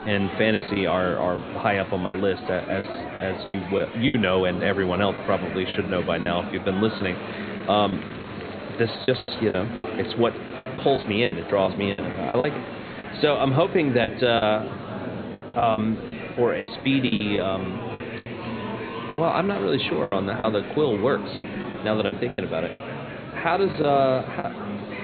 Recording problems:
high frequencies cut off; severe; nothing above 4.5 kHz
murmuring crowd; loud; throughout; 9 dB below the speech
crowd noise; faint; throughout; 25 dB below the speech
choppy; very; 10% of the speech affected

